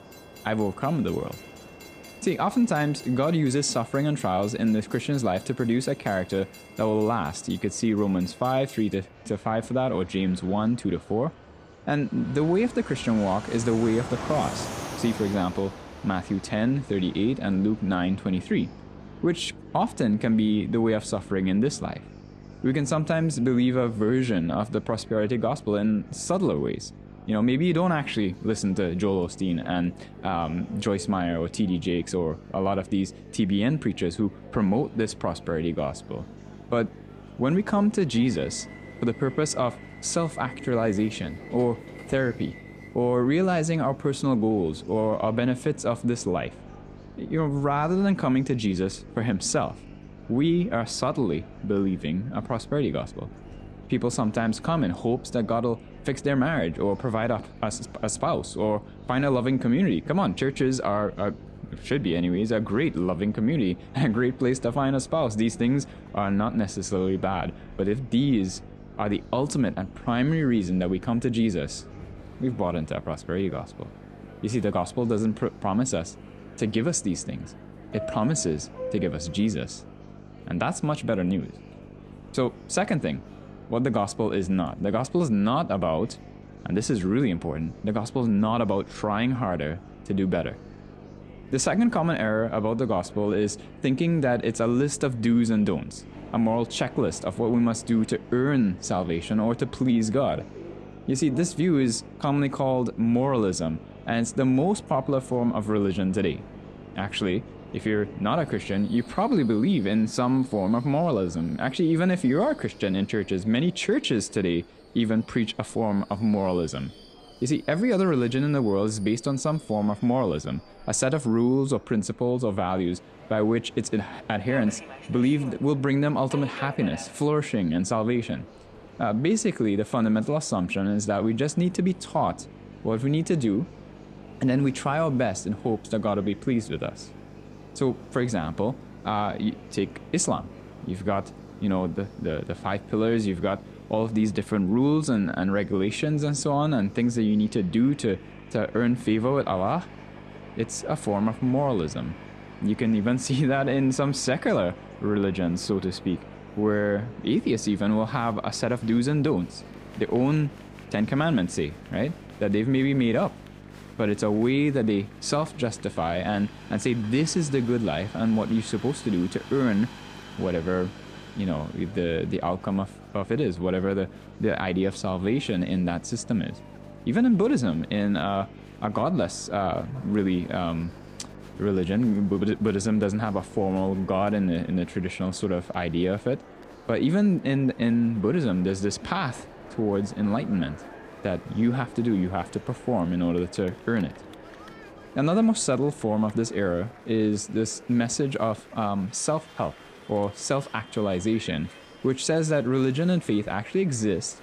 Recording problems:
electrical hum; faint; from 17 s to 1:49 and from 2:12 to 3:05; 50 Hz, 25 dB below the speech
train or aircraft noise; faint; throughout; 20 dB below the speech
murmuring crowd; faint; throughout; 25 dB below the speech

